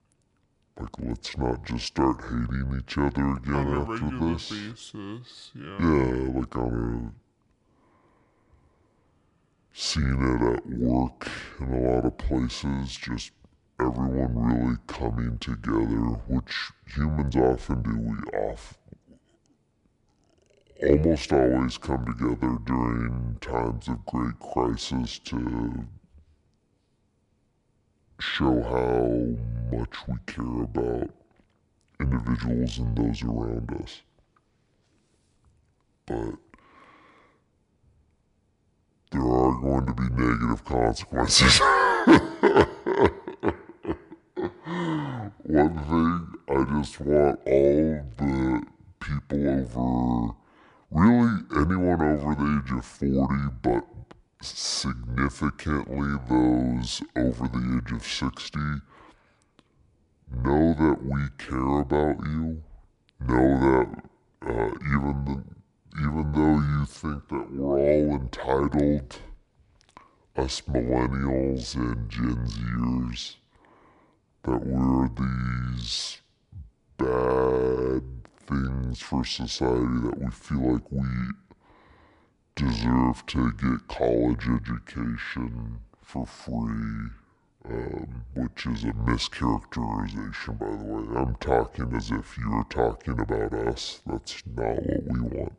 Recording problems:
wrong speed and pitch; too slow and too low; 0.6 times normal speed

